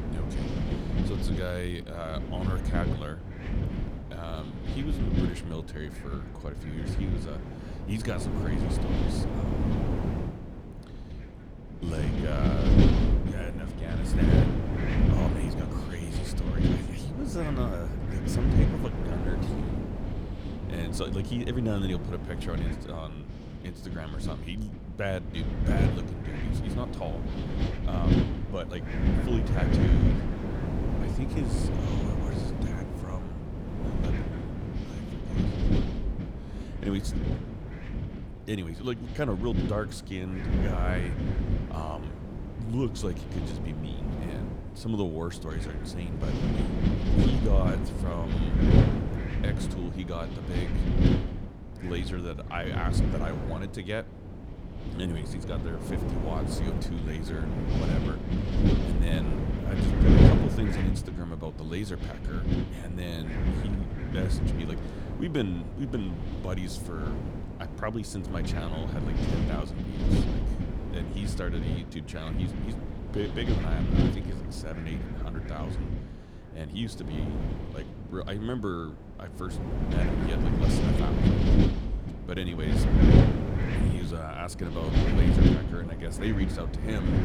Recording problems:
wind noise on the microphone; heavy; 2 dB above the speech

